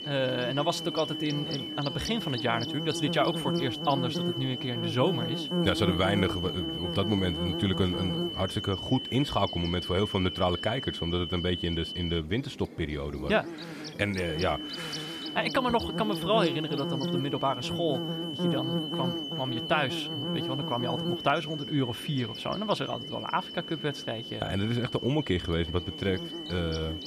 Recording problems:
electrical hum; loud; throughout; 60 Hz, 8 dB below the speech
high-pitched whine; loud; until 12 s and from 14 s on; 3 kHz, 6 dB below the speech

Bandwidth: 14.5 kHz